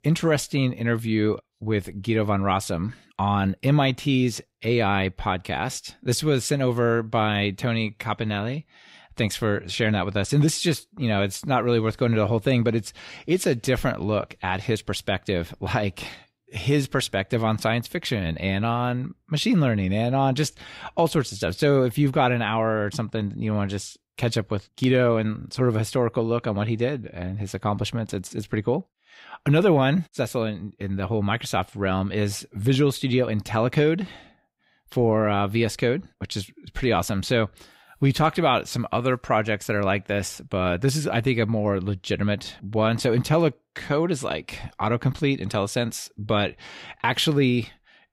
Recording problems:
none

